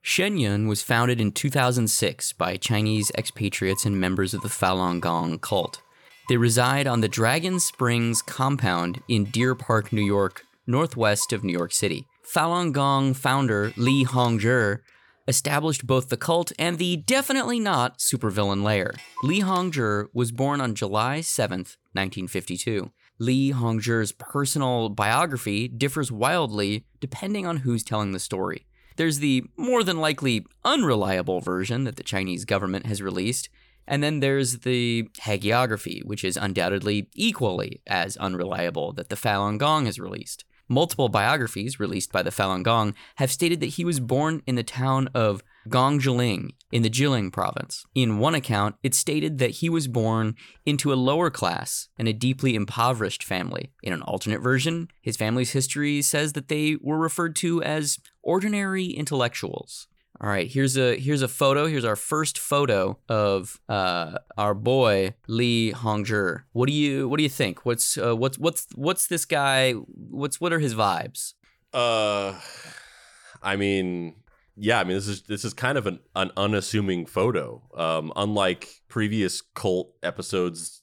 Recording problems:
household noises; faint; throughout; 25 dB below the speech

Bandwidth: 18 kHz